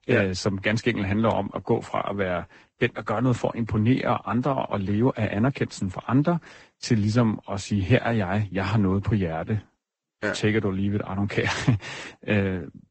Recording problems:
garbled, watery; badly; nothing above 8 kHz

